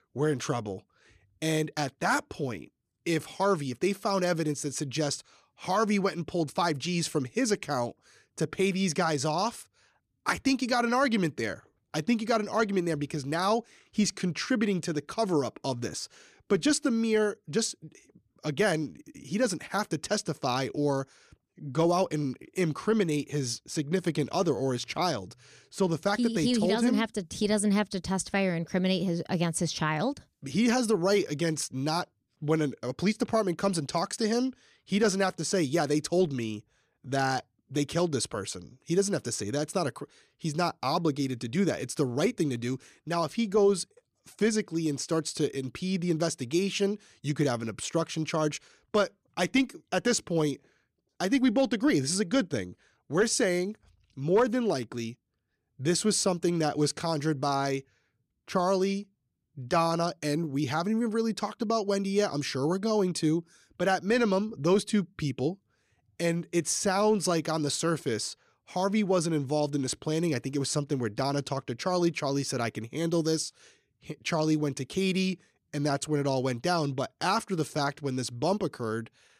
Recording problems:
none

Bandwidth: 14.5 kHz